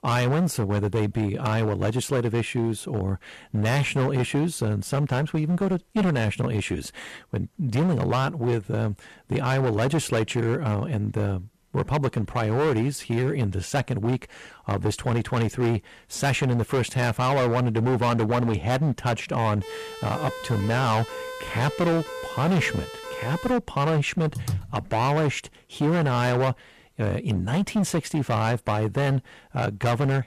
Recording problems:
distortion; heavy; 14% of the sound clipped
siren; noticeable; from 20 to 24 s; peak 10 dB below the speech
keyboard typing; noticeable; at 24 s; peak 5 dB below the speech

